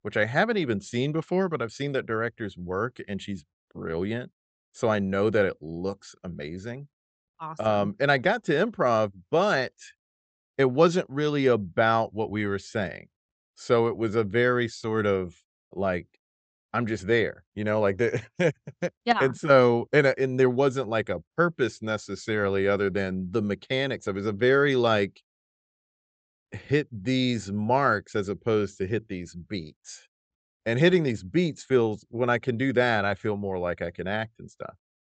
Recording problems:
high frequencies cut off; noticeable; nothing above 8 kHz

